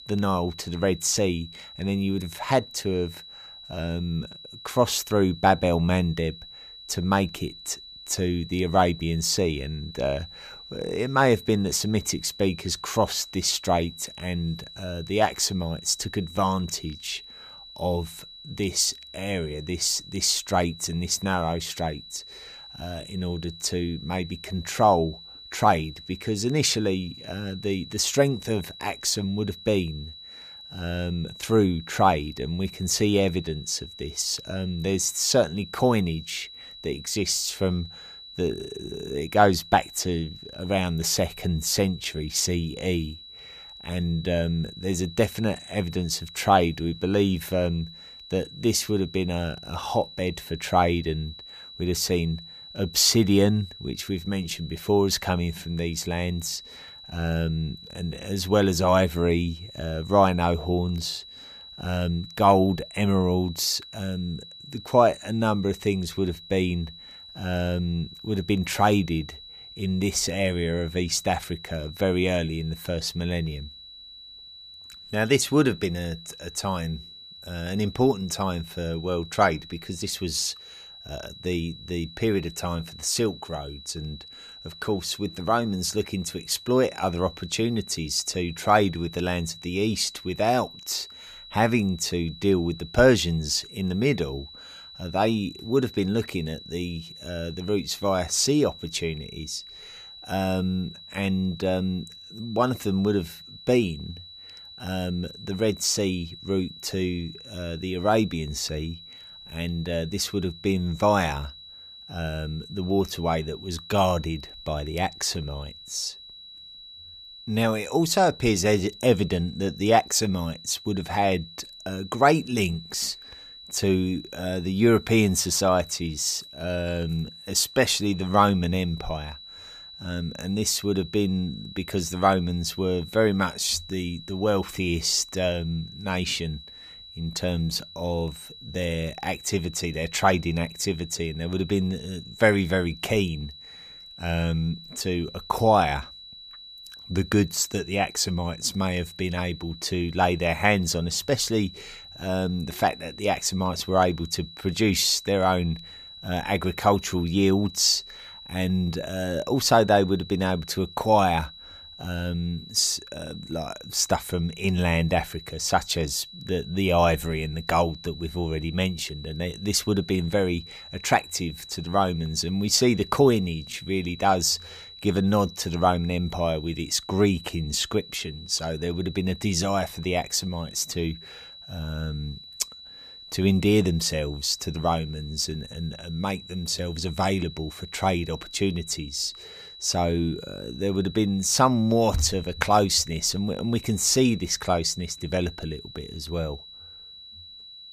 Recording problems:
high-pitched whine; noticeable; throughout; 4 kHz, 15 dB below the speech

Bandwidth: 14.5 kHz